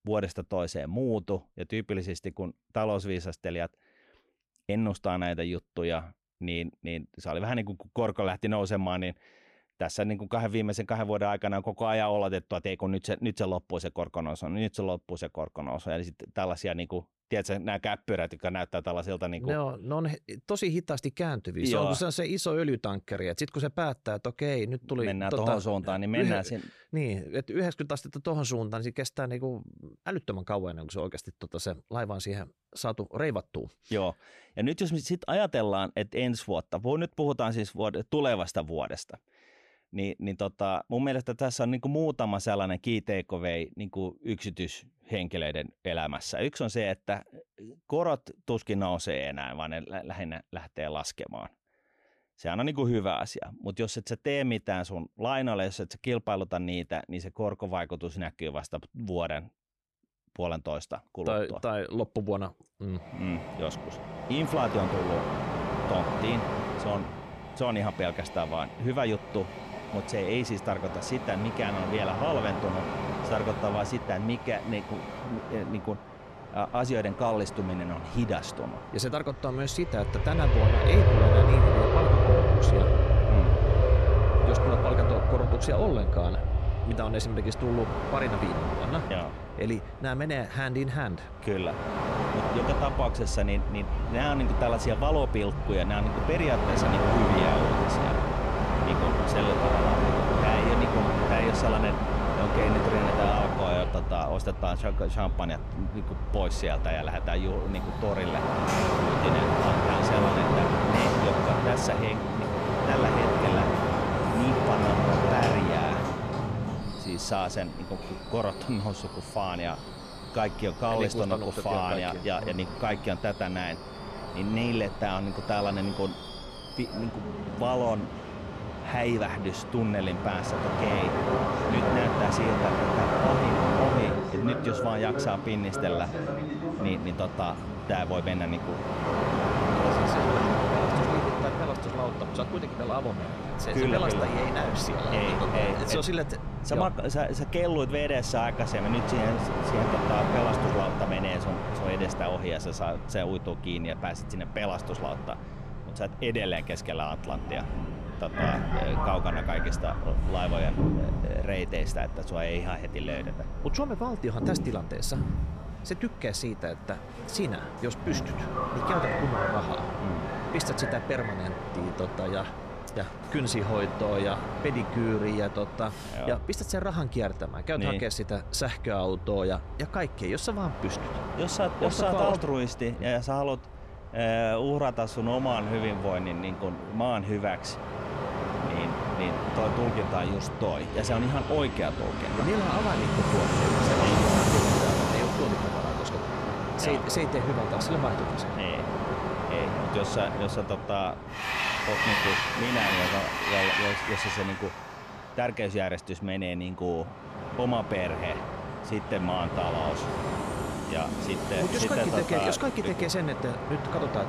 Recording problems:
train or aircraft noise; very loud; from 1:03 on; 2 dB above the speech

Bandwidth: 14.5 kHz